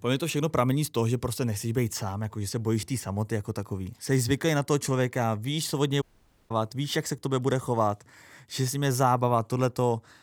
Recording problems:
audio cutting out; at 6 s

